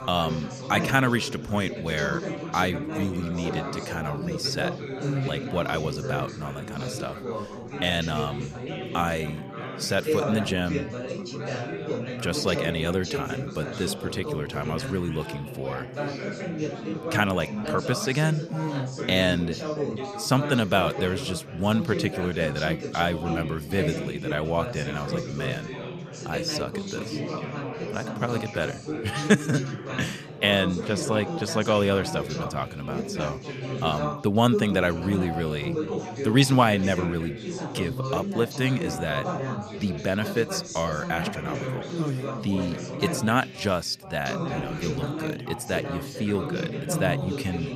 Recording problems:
background chatter; loud; throughout; 4 voices, 5 dB below the speech

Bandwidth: 14.5 kHz